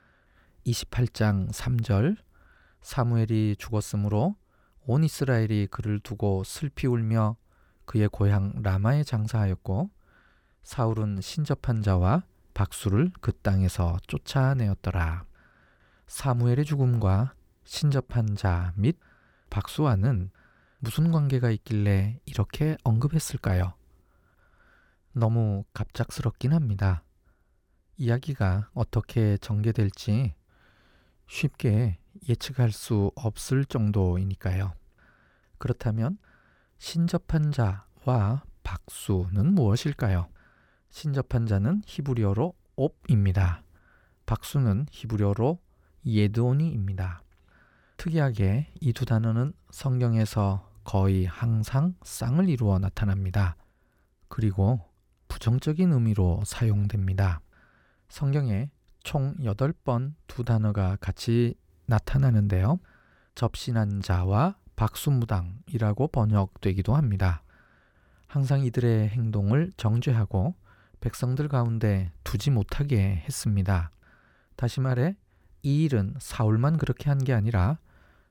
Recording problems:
none

